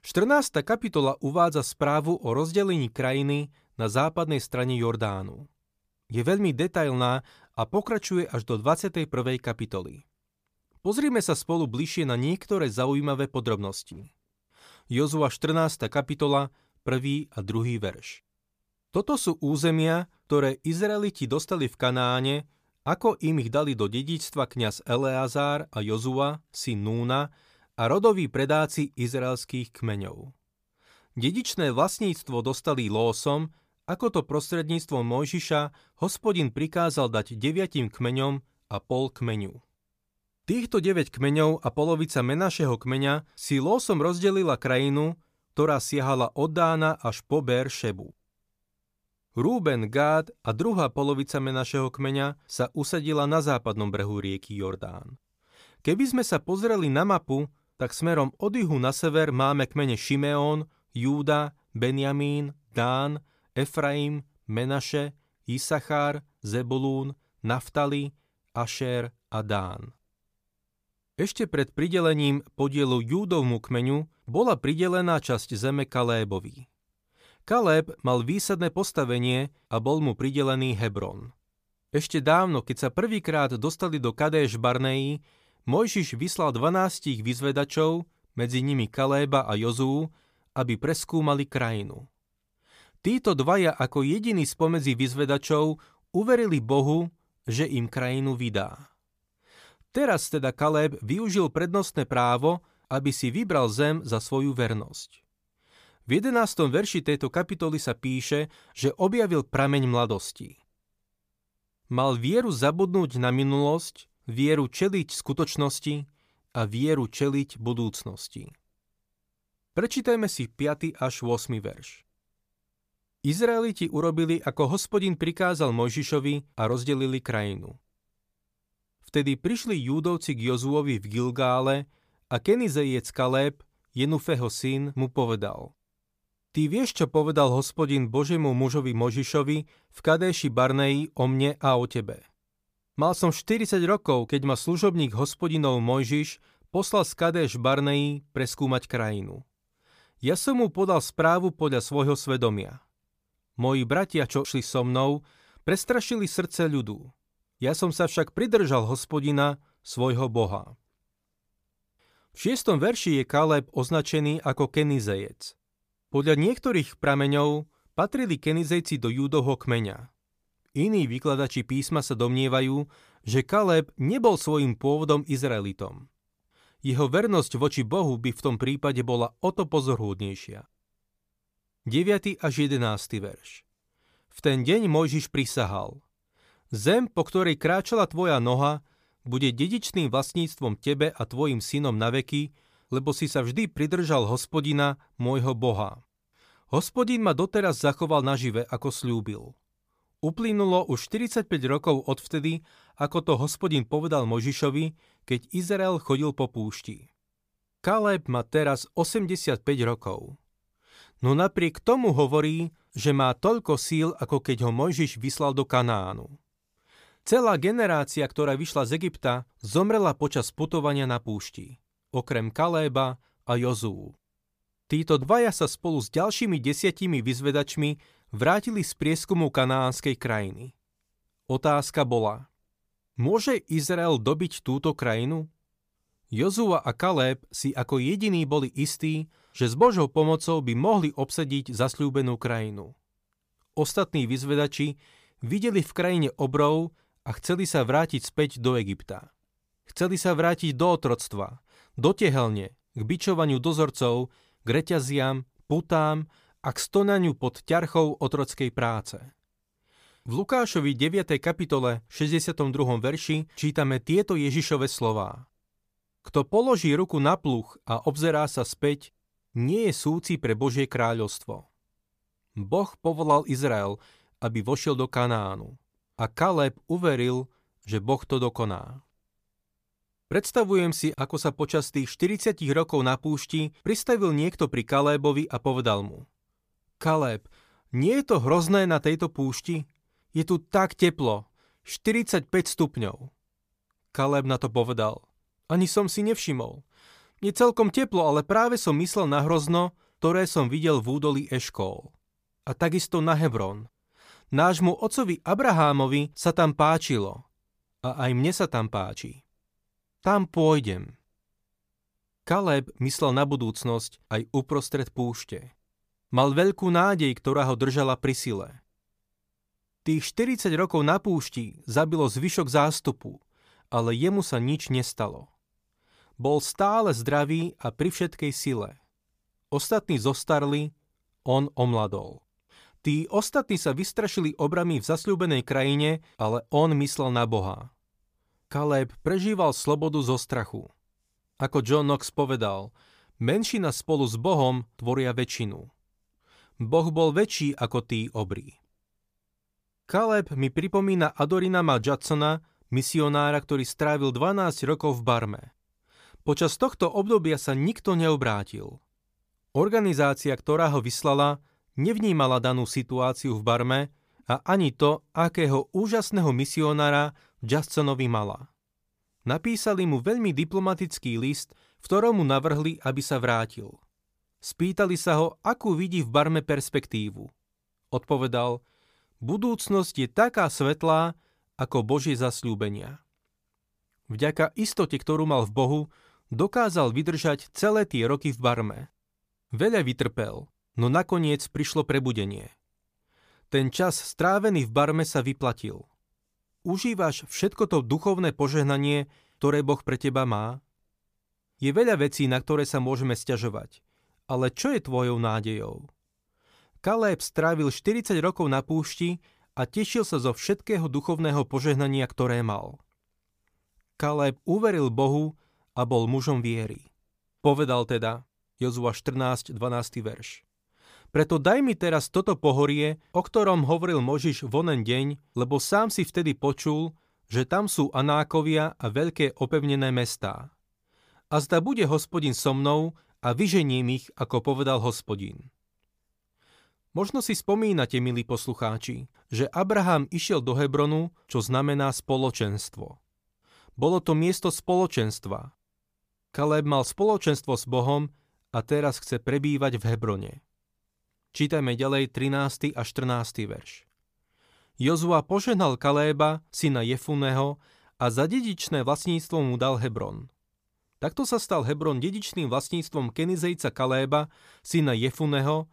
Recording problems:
none

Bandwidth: 15 kHz